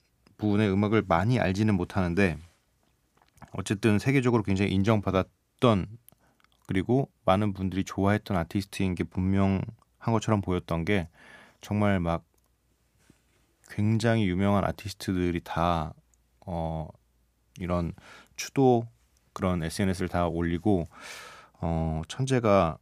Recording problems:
none

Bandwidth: 15 kHz